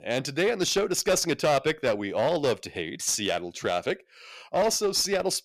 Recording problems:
distortion; slight; 7% of the sound clipped

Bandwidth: 14.5 kHz